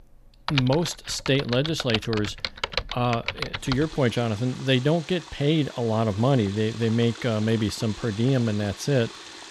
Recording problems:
household noises; loud; throughout; 10 dB below the speech

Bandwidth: 14.5 kHz